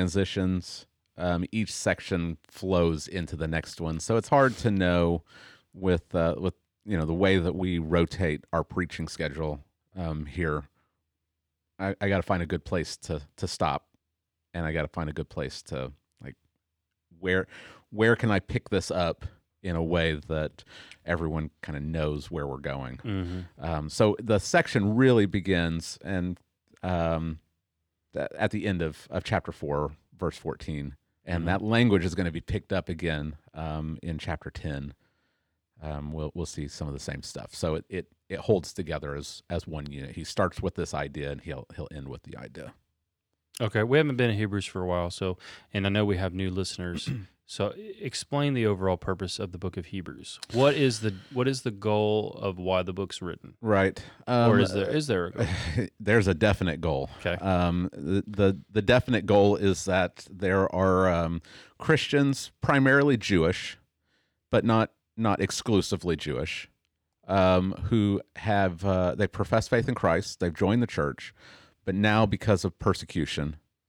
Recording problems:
abrupt cut into speech; at the start

